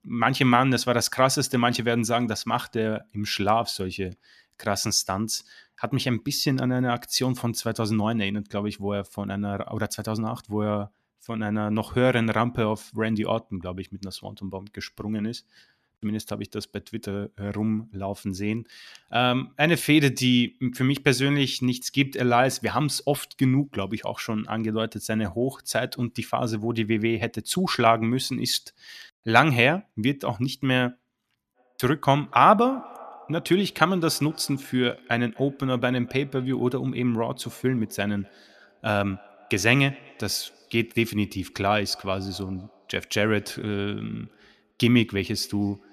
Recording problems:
echo of what is said; faint; from 32 s on; 250 ms later, 25 dB below the speech

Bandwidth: 14.5 kHz